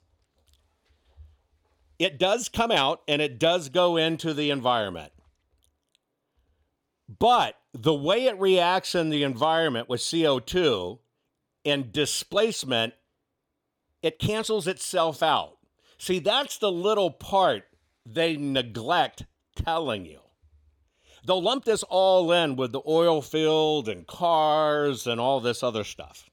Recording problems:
uneven, jittery; strongly; from 2 to 23 s

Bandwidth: 18 kHz